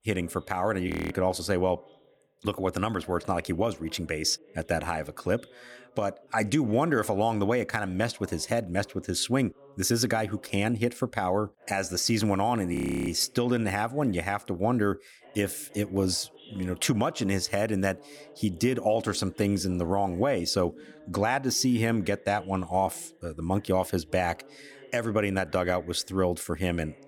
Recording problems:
voice in the background; faint; throughout; 25 dB below the speech
audio freezing; at 1 s and at 13 s

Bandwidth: 18.5 kHz